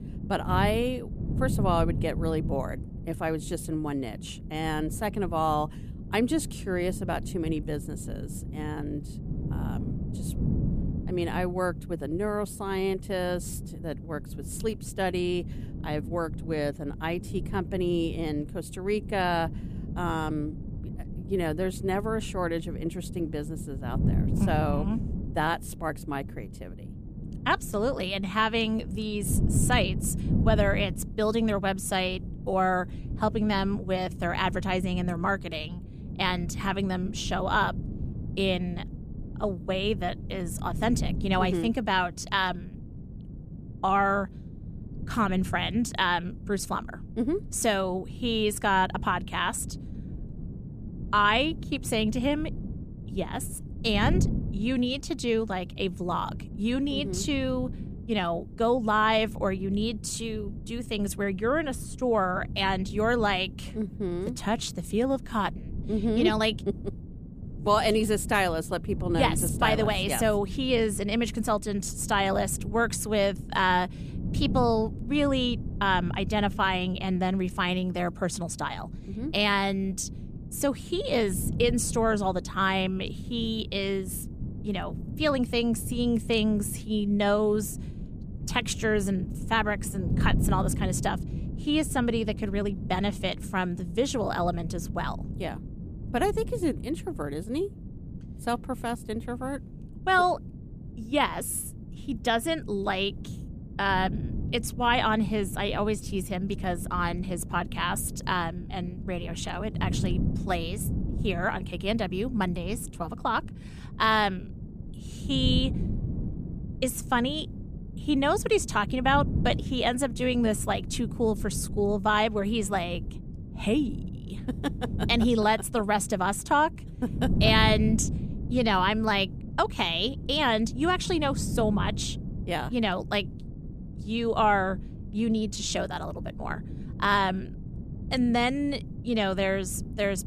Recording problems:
wind noise on the microphone; occasional gusts; 15 dB below the speech

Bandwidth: 14.5 kHz